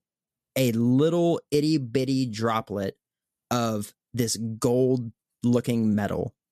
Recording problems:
none

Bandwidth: 13.5 kHz